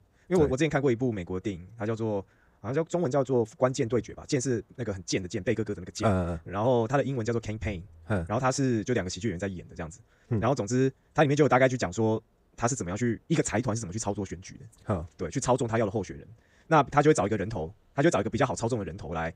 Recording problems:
wrong speed, natural pitch; too fast; 1.6 times normal speed

